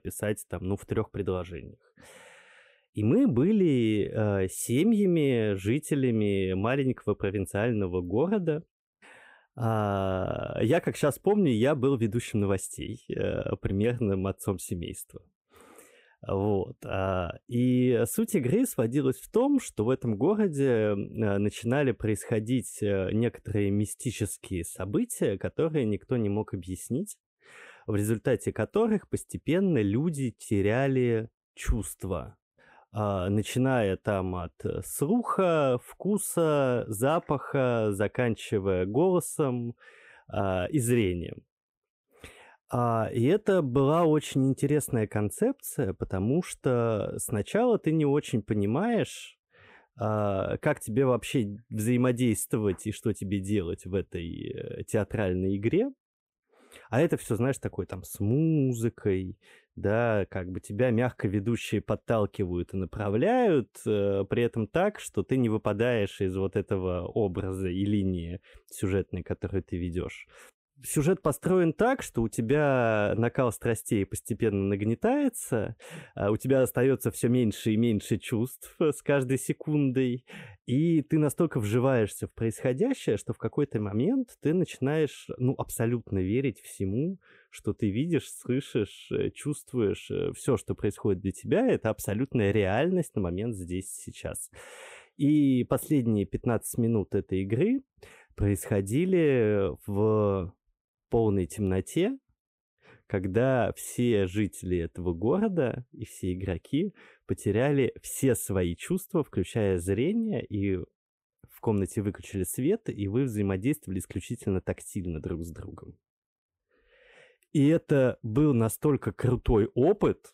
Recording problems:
none

